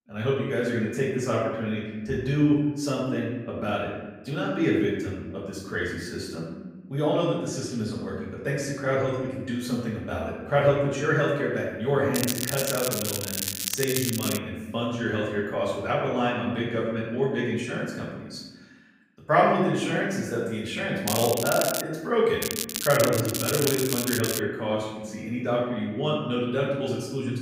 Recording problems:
off-mic speech; far
room echo; noticeable; dies away in 1.1 s
crackling; loud; from 12 to 14 s, at 21 s and from 22 to 24 s; 2 dB below the speech

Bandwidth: 15.5 kHz